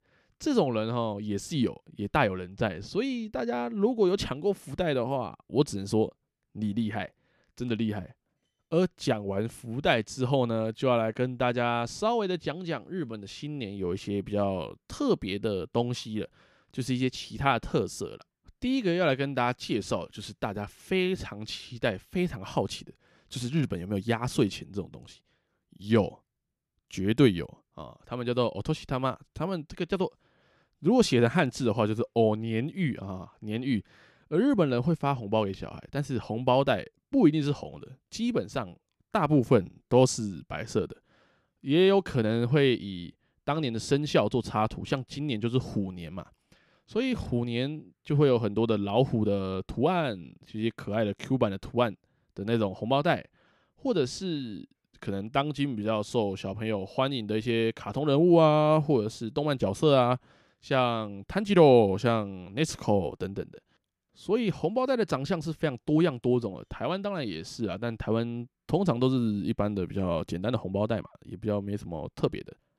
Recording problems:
none

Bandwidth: 14.5 kHz